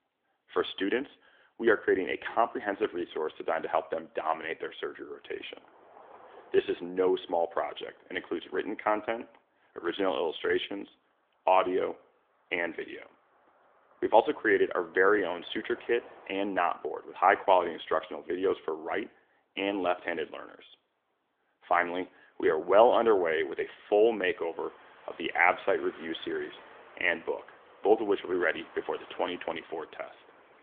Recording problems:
phone-call audio; nothing above 3.5 kHz
traffic noise; faint; throughout; 25 dB below the speech

